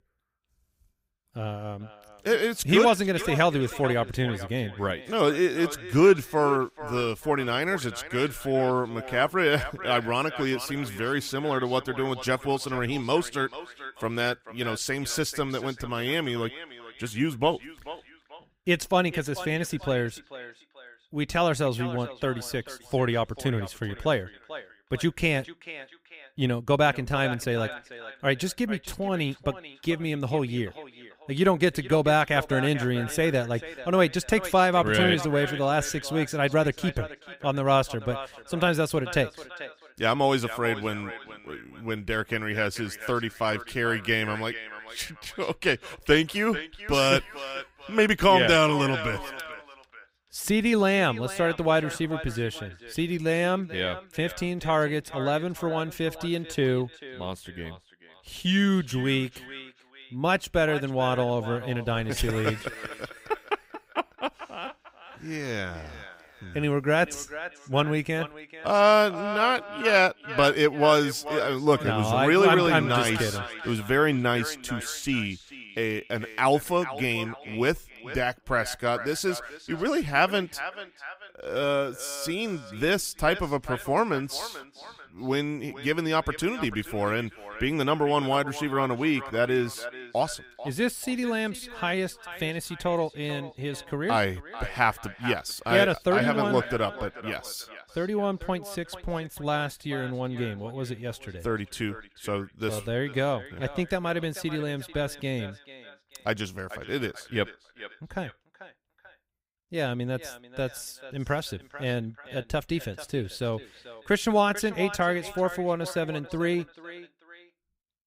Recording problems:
echo of what is said; noticeable; throughout; 440 ms later, 15 dB below the speech

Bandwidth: 15.5 kHz